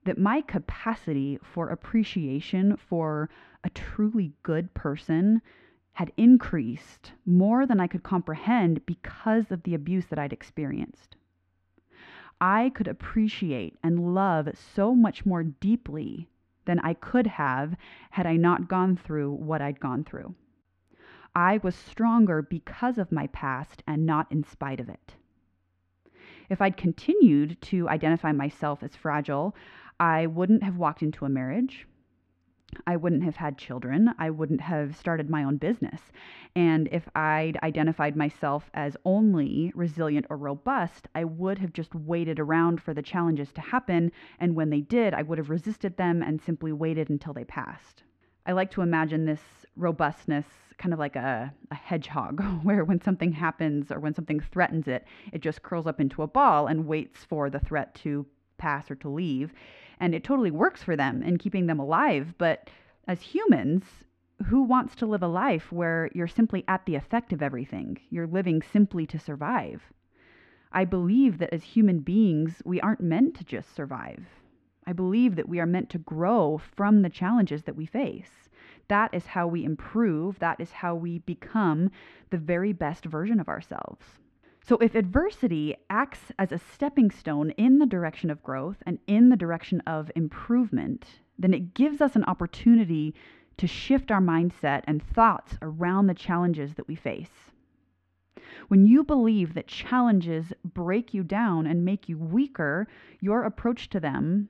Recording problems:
muffled; very; fading above 2 kHz

